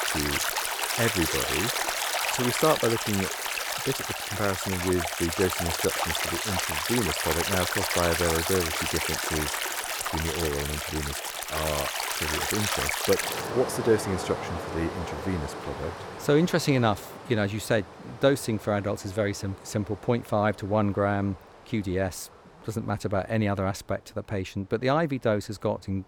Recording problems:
rain or running water; very loud; throughout; as loud as the speech

